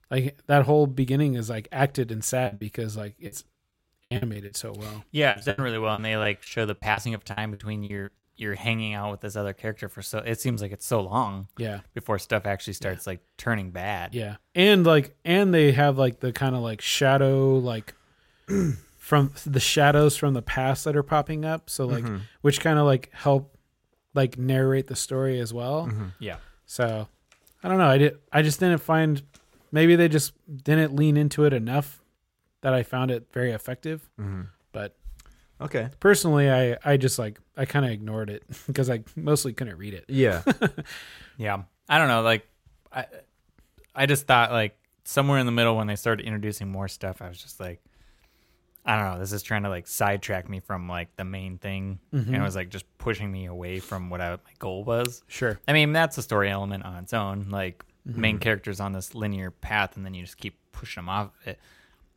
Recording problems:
choppy; very; from 2.5 to 4.5 s and from 5.5 to 8 s; 18% of the speech affected

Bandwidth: 16 kHz